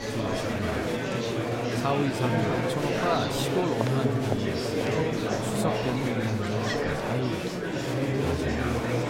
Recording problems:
murmuring crowd; very loud; throughout; 4 dB above the speech

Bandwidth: 16 kHz